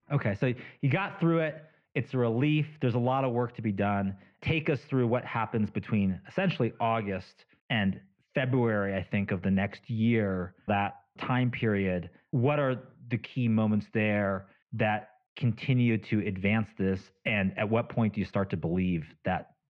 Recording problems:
muffled; very; fading above 2.5 kHz

